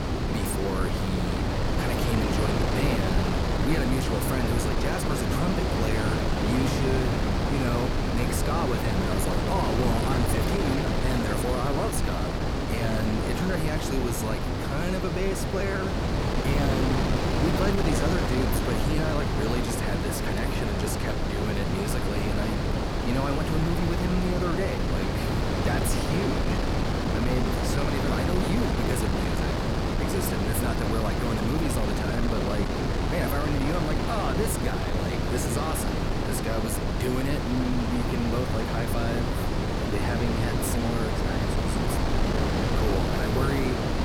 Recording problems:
wind noise on the microphone; heavy; 3 dB above the speech

